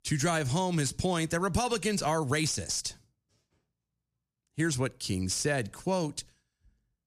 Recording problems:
none

